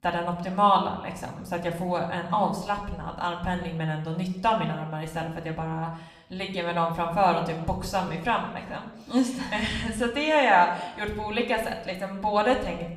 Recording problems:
room echo; slight; dies away in 0.8 s
off-mic speech; somewhat distant

